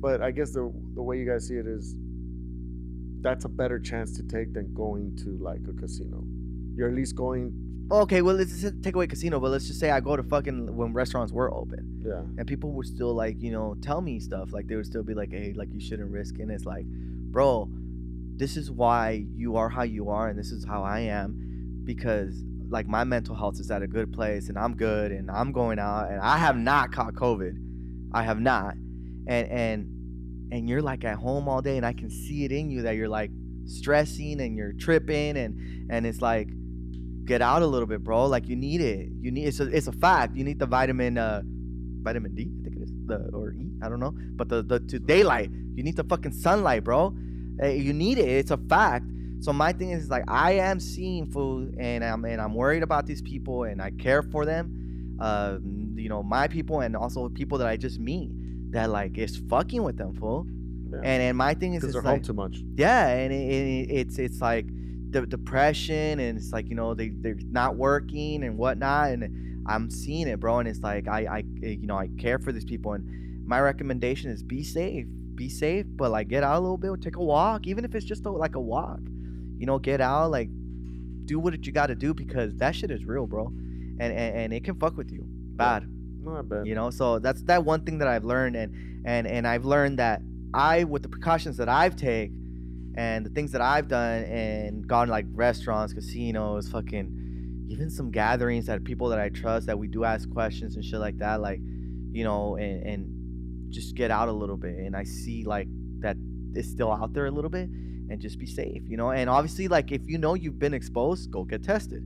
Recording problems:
electrical hum; faint; throughout; 60 Hz, 20 dB below the speech

